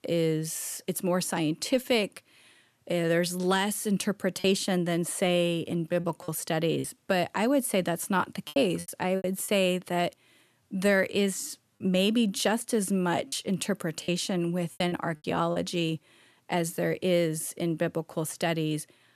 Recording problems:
choppy; very; from 4.5 to 7 s, from 8.5 to 12 s and from 13 to 16 s; 8% of the speech affected

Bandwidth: 13.5 kHz